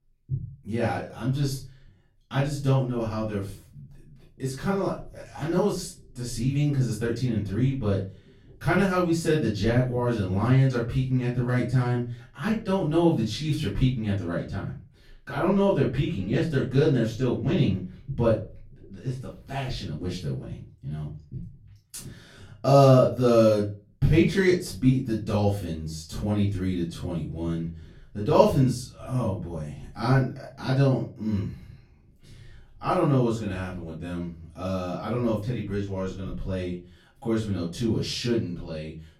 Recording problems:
off-mic speech; far
room echo; slight; dies away in 0.3 s

